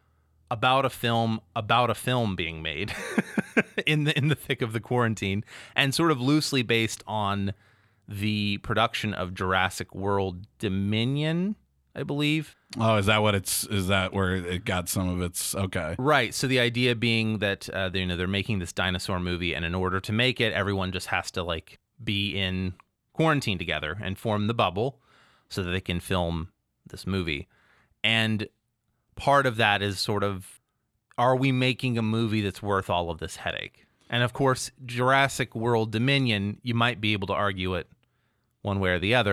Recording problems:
abrupt cut into speech; at the end

